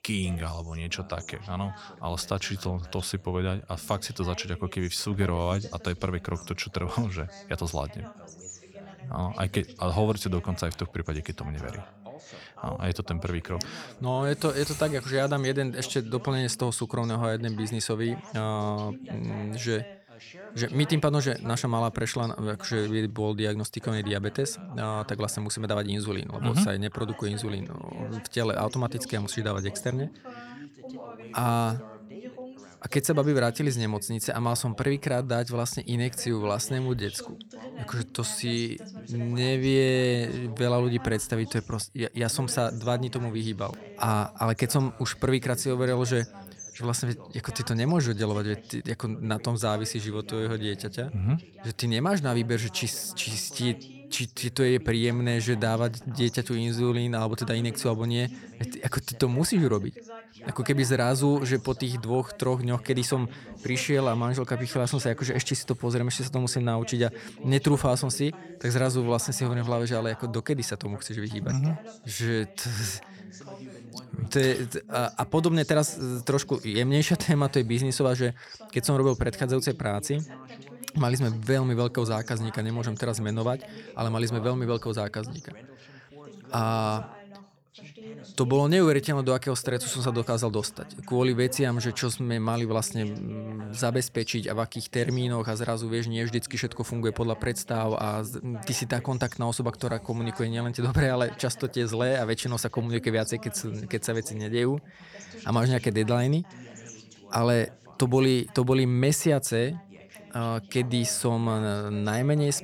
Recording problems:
background chatter; noticeable; throughout; 2 voices, 20 dB below the speech

